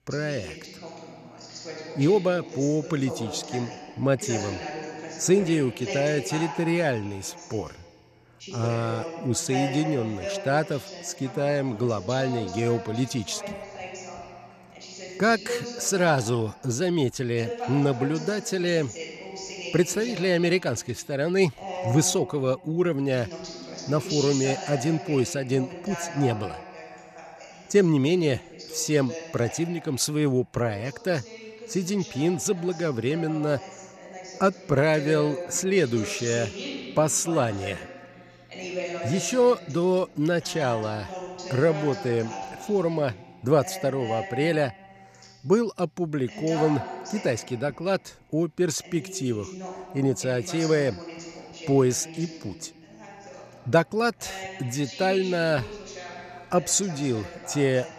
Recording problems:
voice in the background; noticeable; throughout; 10 dB below the speech

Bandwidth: 14.5 kHz